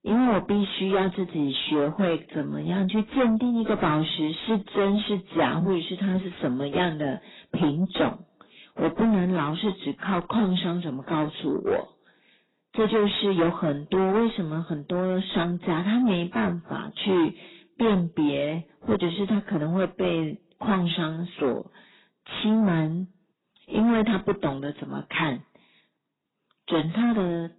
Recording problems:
distortion; heavy; 8 dB below the speech
garbled, watery; badly; nothing above 4 kHz

